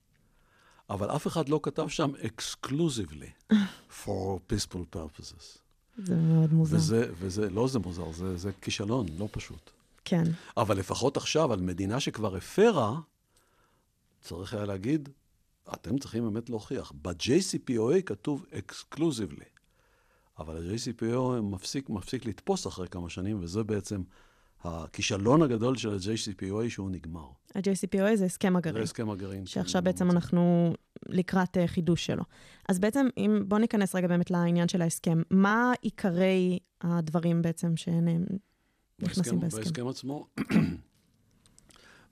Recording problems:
none

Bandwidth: 14 kHz